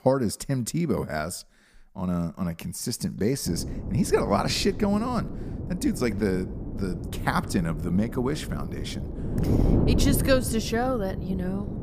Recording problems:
wind noise on the microphone; heavy; from 3.5 s on; 8 dB below the speech

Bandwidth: 15 kHz